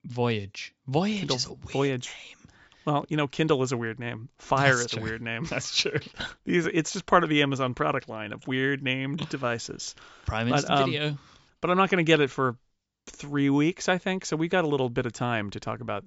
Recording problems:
high frequencies cut off; noticeable; nothing above 8 kHz

